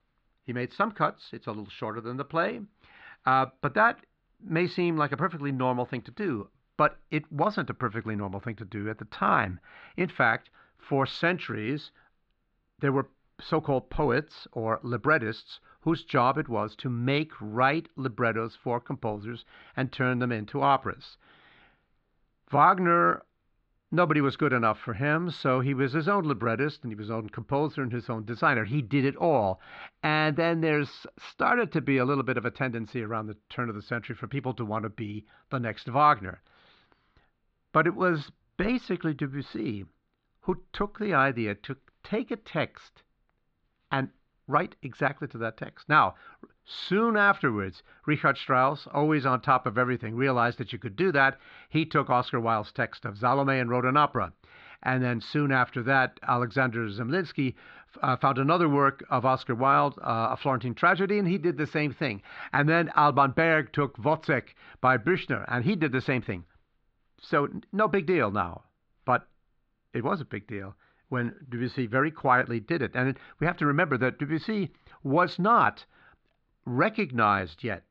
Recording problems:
muffled; slightly; fading above 4 kHz

